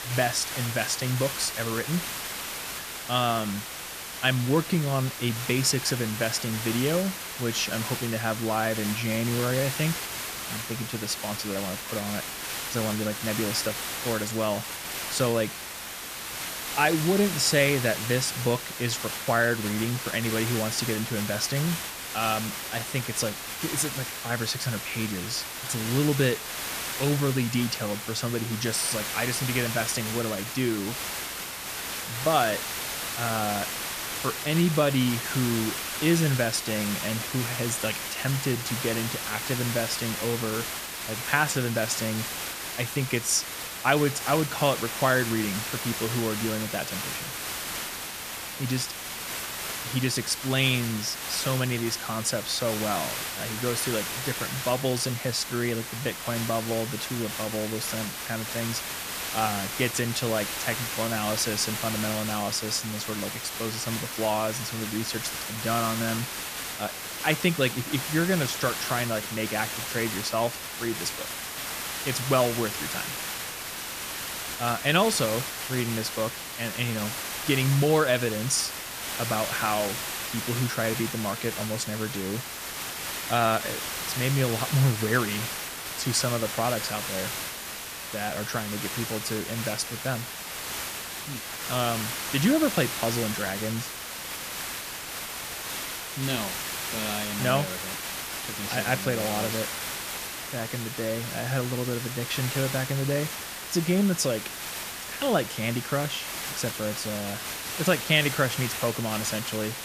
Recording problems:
hiss; loud; throughout; 4 dB below the speech

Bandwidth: 14.5 kHz